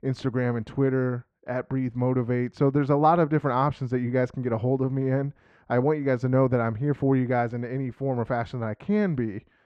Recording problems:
muffled; very; fading above 2 kHz

